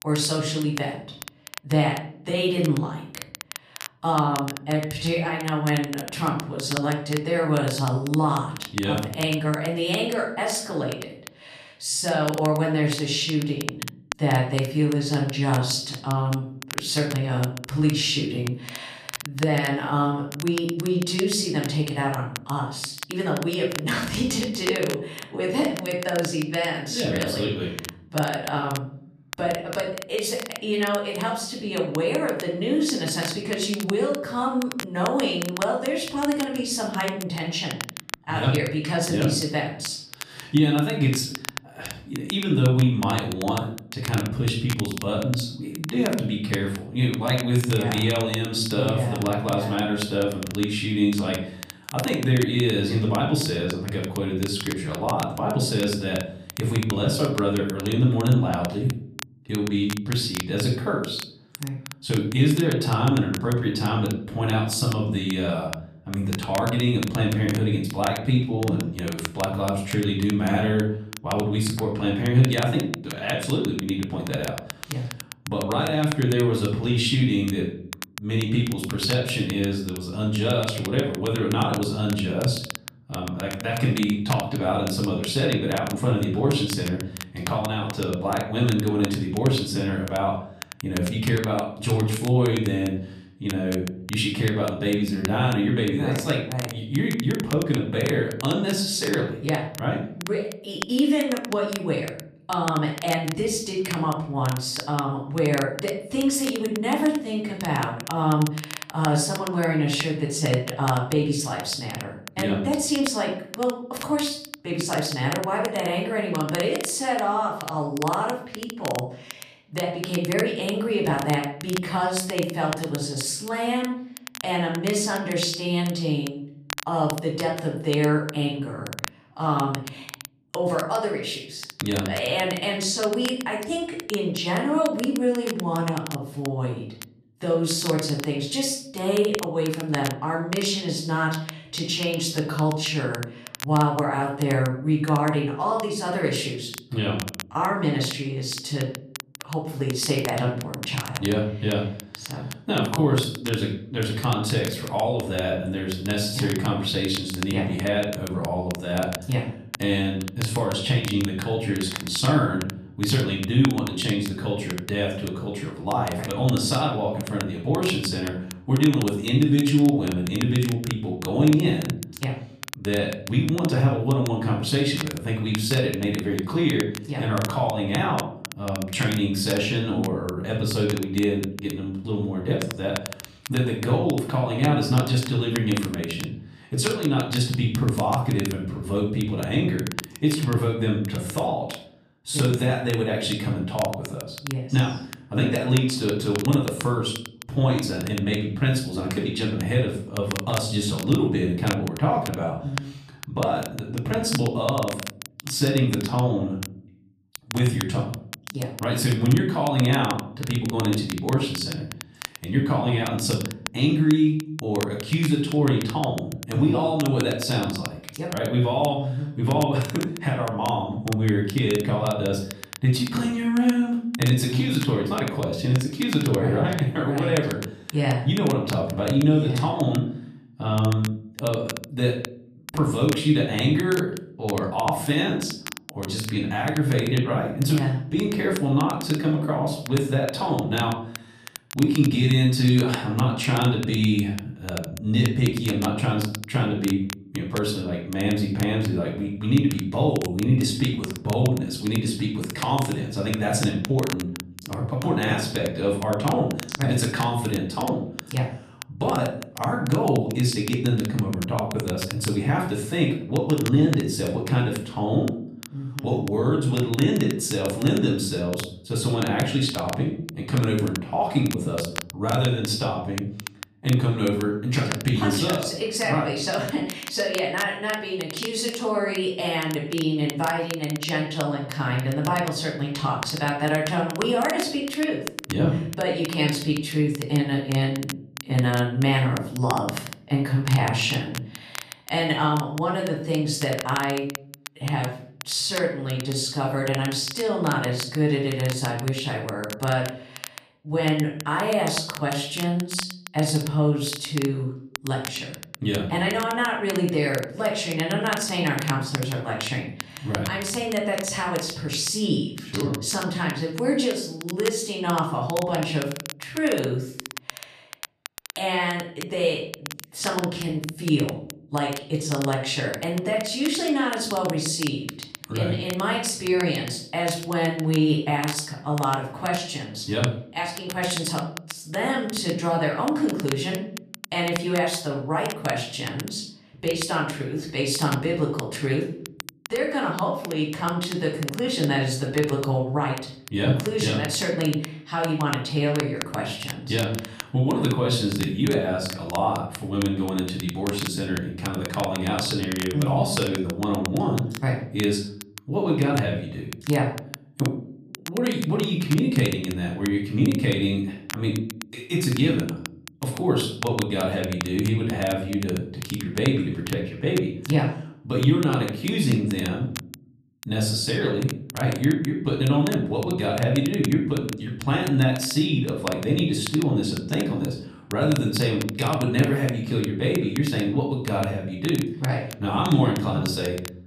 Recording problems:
off-mic speech; far
room echo; noticeable; dies away in 0.6 s
crackle, like an old record; noticeable; 15 dB below the speech

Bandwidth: 14.5 kHz